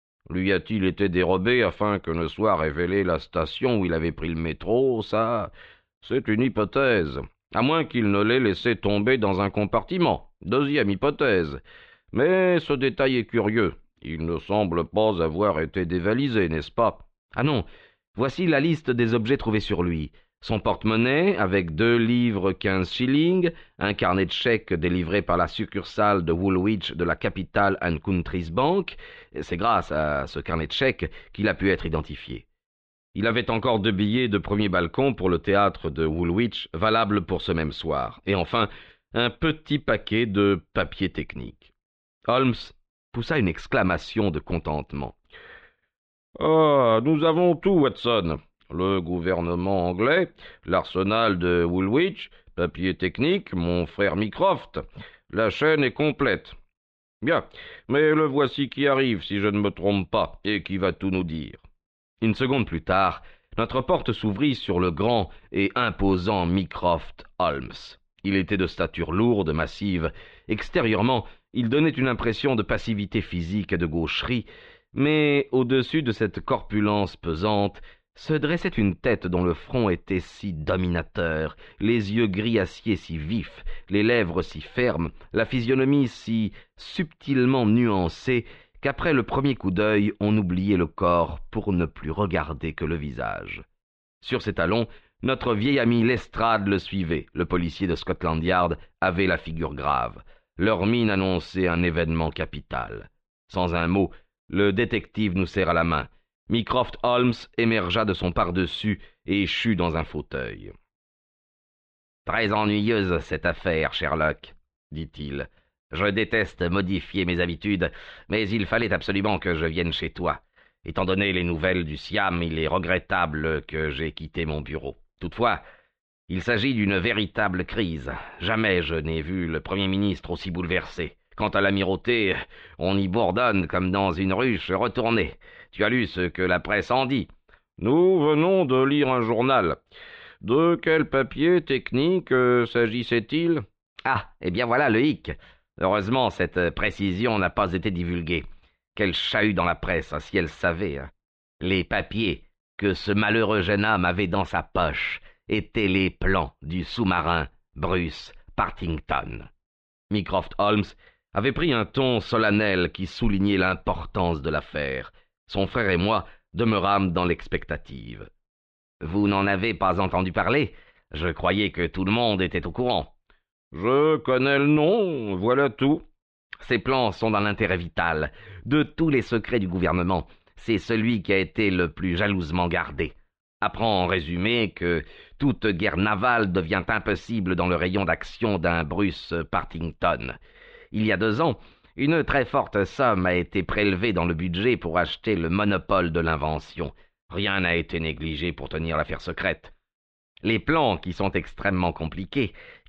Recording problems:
muffled; very; fading above 3.5 kHz

